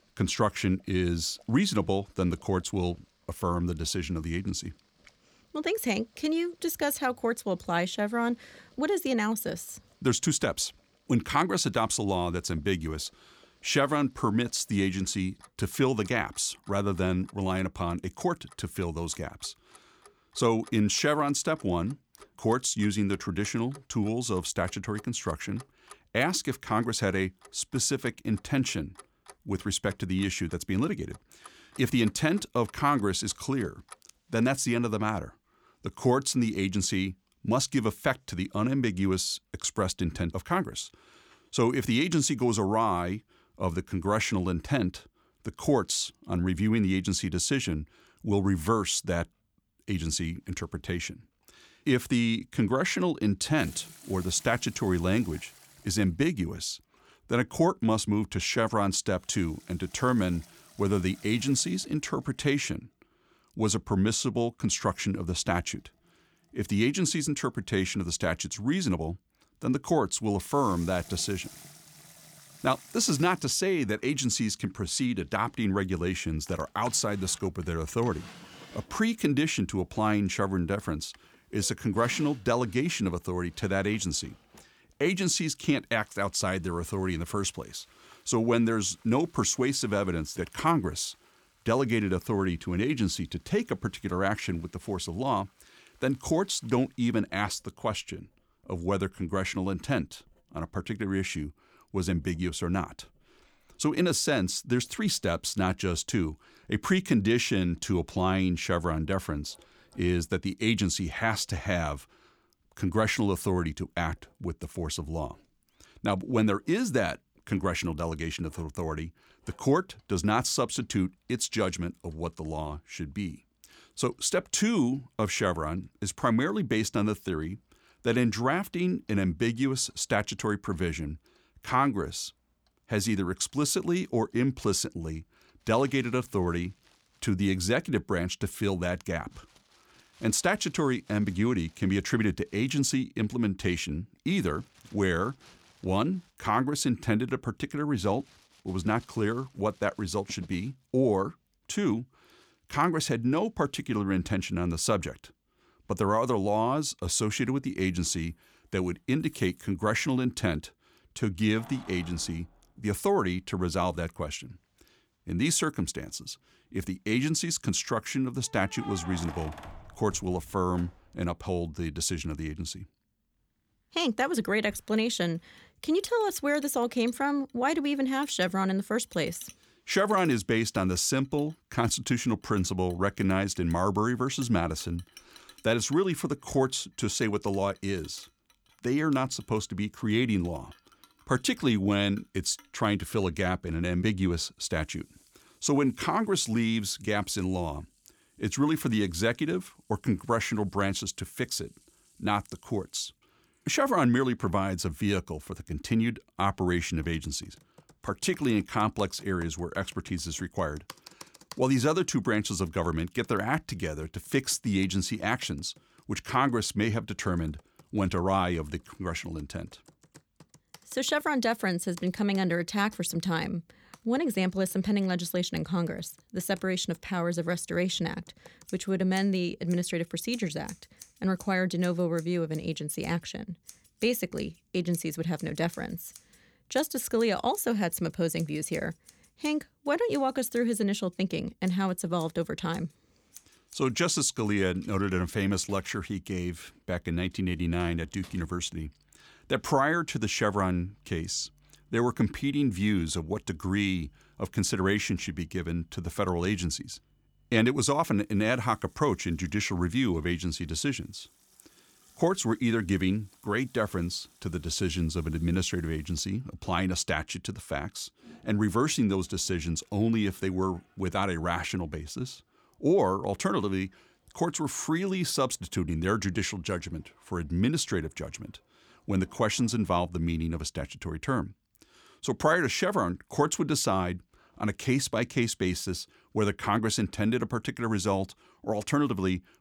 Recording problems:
household noises; faint; throughout; 25 dB below the speech

